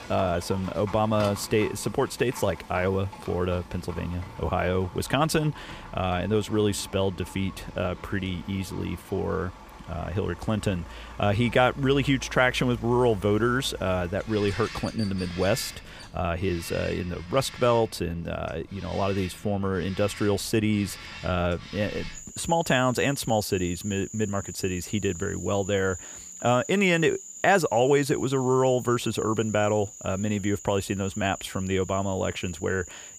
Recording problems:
animal sounds; noticeable; throughout; 15 dB below the speech

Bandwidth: 15 kHz